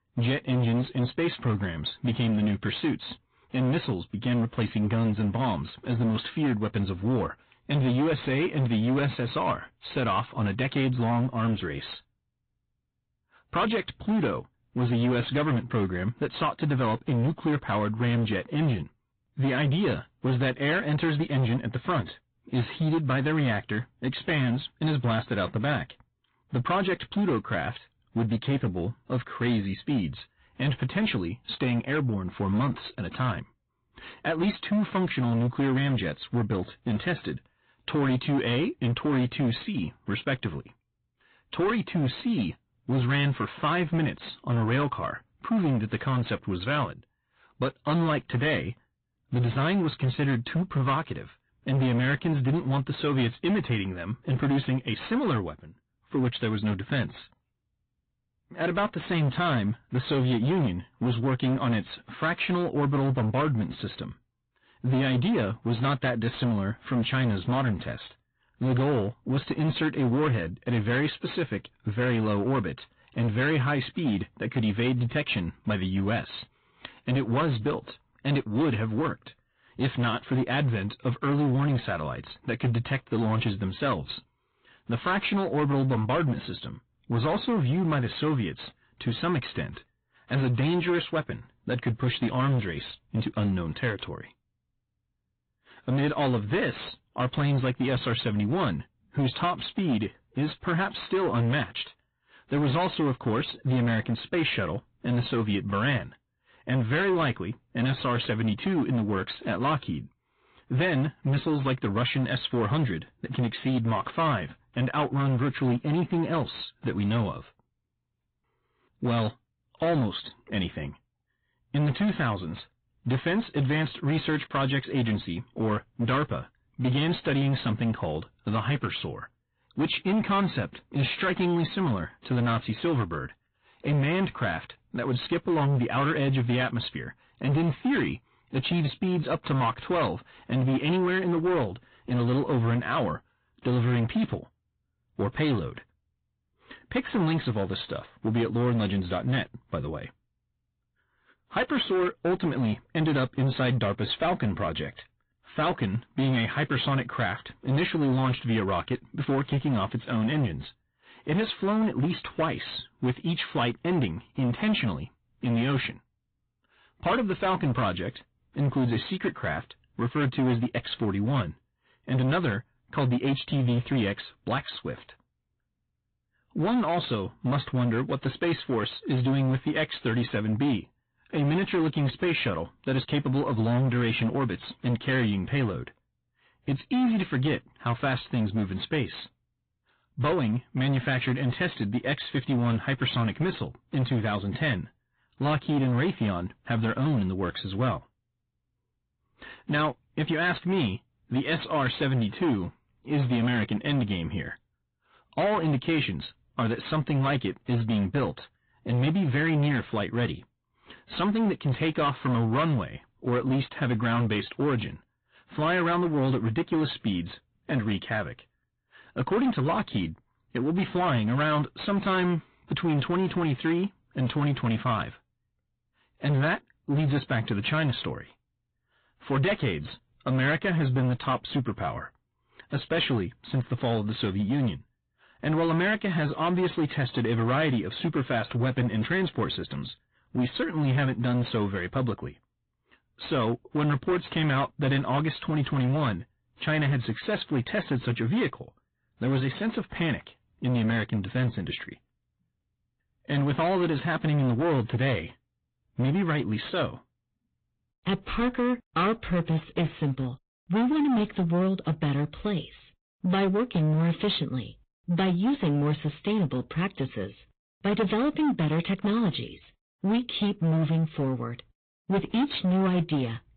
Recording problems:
high frequencies cut off; severe; nothing above 4 kHz
distortion; slight; 14% of the sound clipped
garbled, watery; slightly

